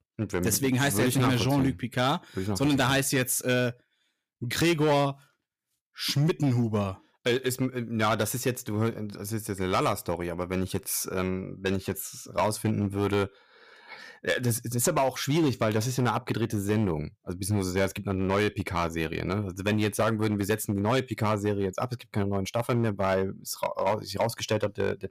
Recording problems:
distortion; slight; 6% of the sound clipped

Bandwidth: 15 kHz